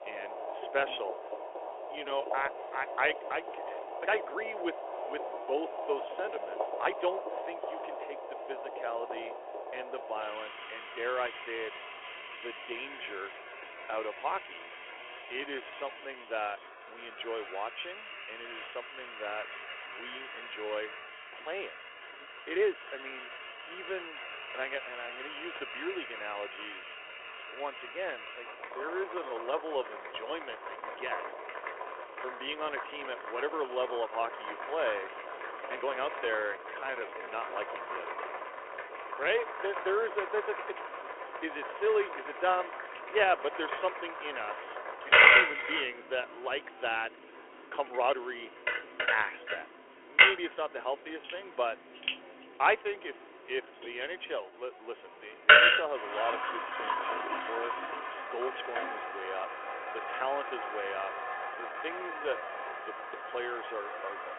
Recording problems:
phone-call audio; nothing above 3.5 kHz
household noises; very loud; throughout; 3 dB above the speech
uneven, jittery; strongly; from 2 s to 1:03

